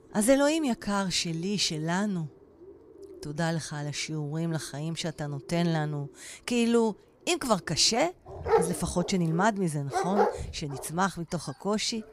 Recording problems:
animal sounds; loud; throughout; 4 dB below the speech

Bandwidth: 15.5 kHz